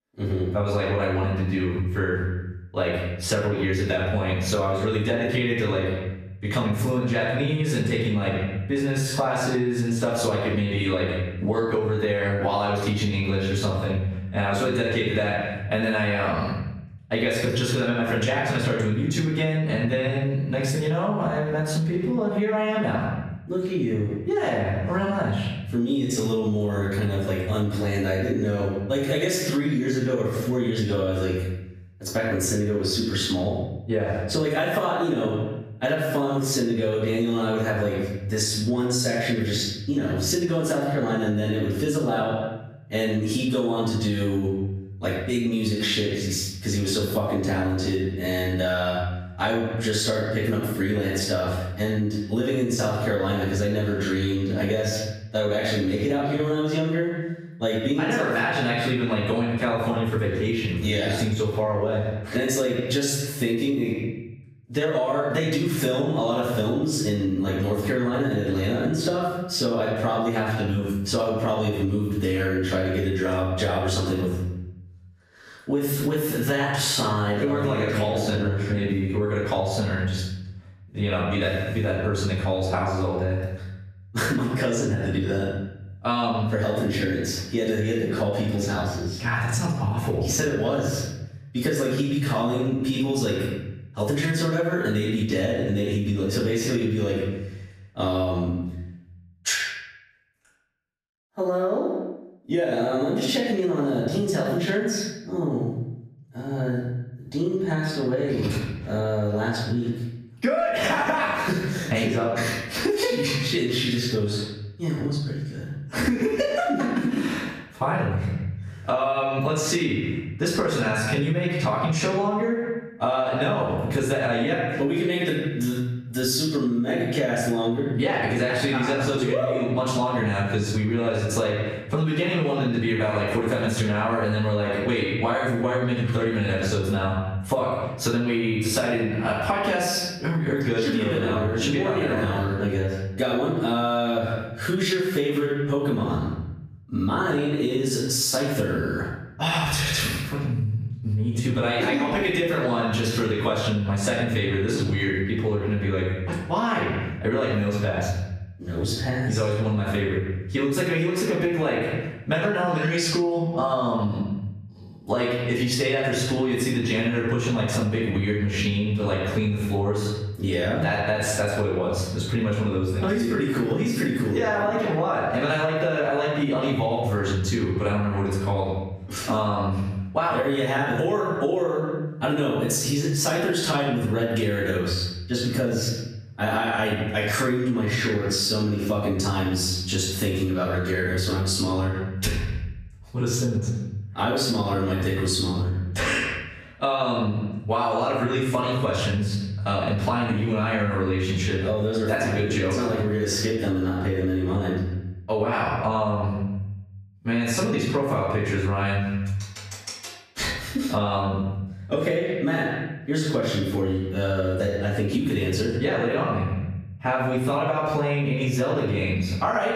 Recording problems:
off-mic speech; far
room echo; noticeable; dies away in 0.8 s
squashed, flat; somewhat

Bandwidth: 14.5 kHz